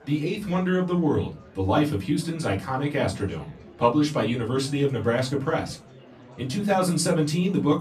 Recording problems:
off-mic speech; far
room echo; very slight; dies away in 0.3 s
murmuring crowd; faint; throughout; 25 dB below the speech

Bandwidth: 14.5 kHz